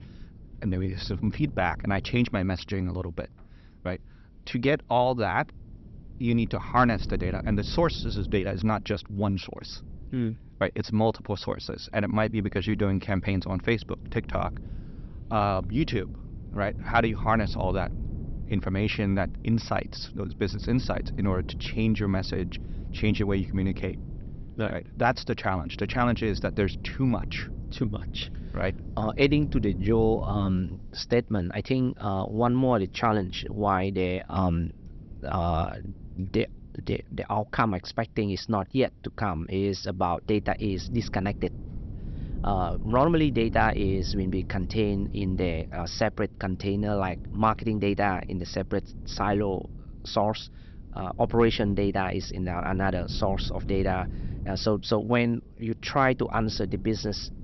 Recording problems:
high frequencies cut off; noticeable; nothing above 5.5 kHz
wind noise on the microphone; occasional gusts; 20 dB below the speech

